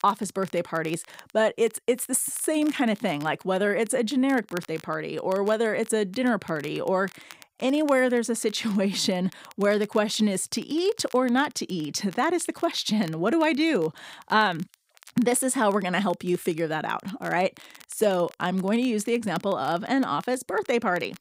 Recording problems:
crackle, like an old record; faint; 25 dB below the speech

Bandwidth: 15.5 kHz